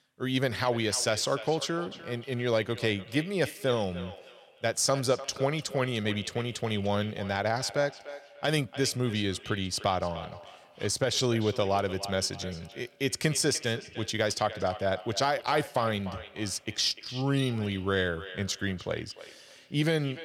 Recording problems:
echo of what is said; noticeable; throughout; 300 ms later, 15 dB below the speech

